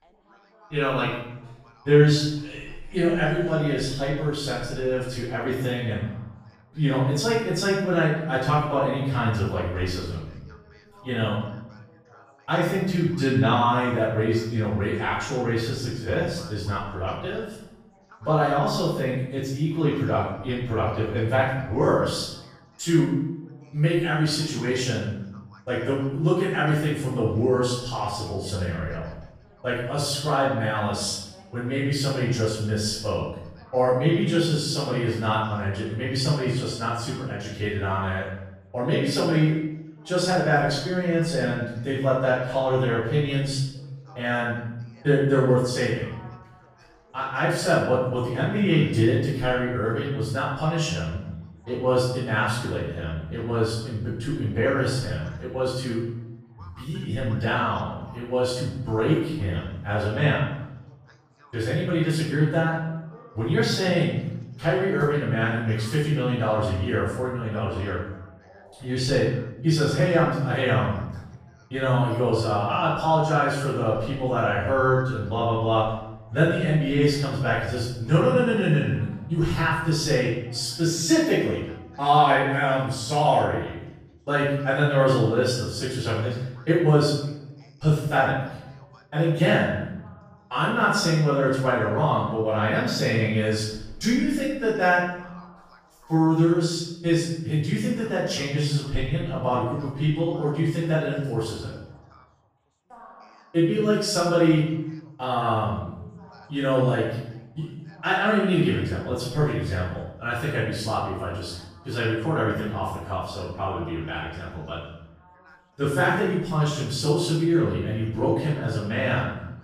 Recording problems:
room echo; strong; dies away in 0.8 s
off-mic speech; far
background chatter; faint; throughout; 3 voices, 30 dB below the speech

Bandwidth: 15 kHz